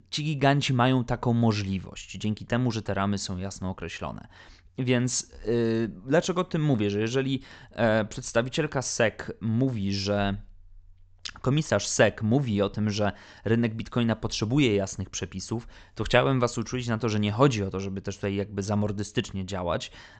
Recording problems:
high frequencies cut off; noticeable; nothing above 8 kHz

